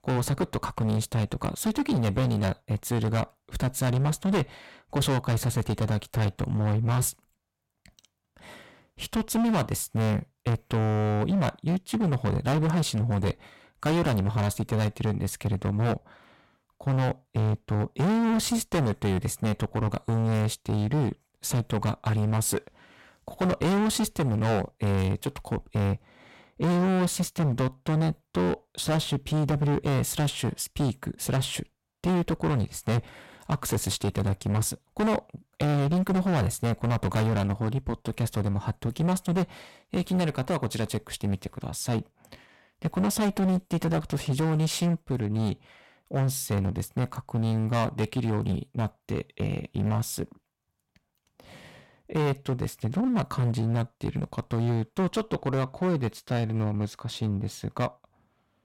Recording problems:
distortion; heavy; 17% of the sound clipped

